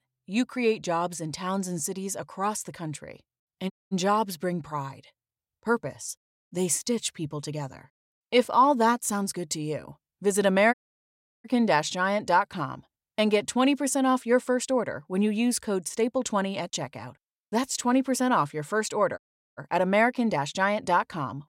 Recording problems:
audio cutting out; at 3.5 s, at 11 s for 0.5 s and at 19 s

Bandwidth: 16 kHz